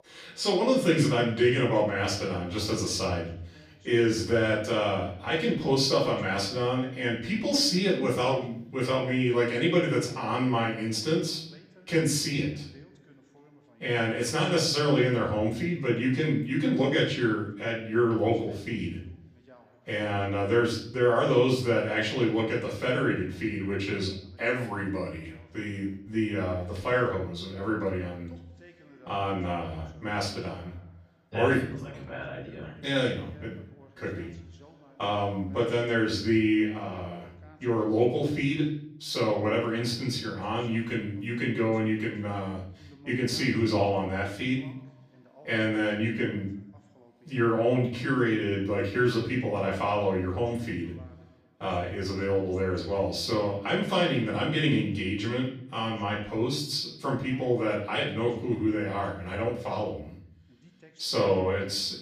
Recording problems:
off-mic speech; far
room echo; noticeable; dies away in 0.6 s
voice in the background; faint; throughout; 30 dB below the speech

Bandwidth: 14.5 kHz